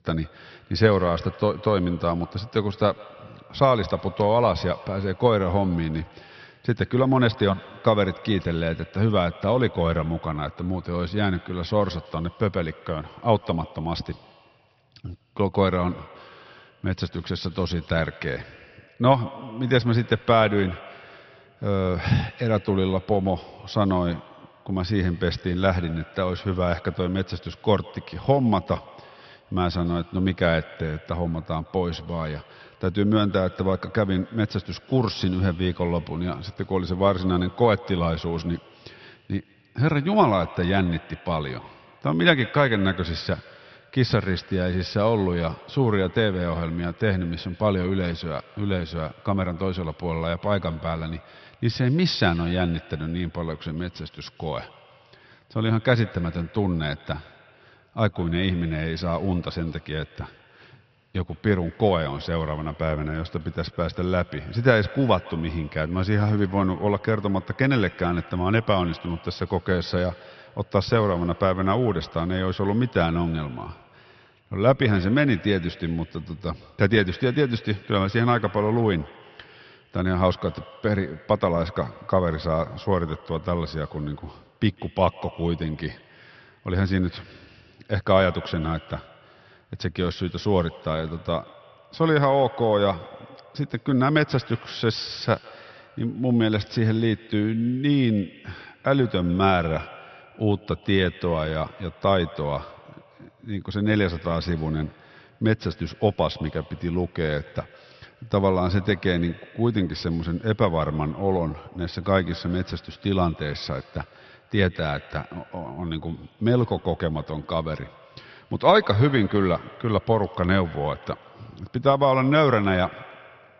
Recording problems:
high frequencies cut off; noticeable; nothing above 5.5 kHz
echo of what is said; faint; throughout; 150 ms later, 20 dB below the speech

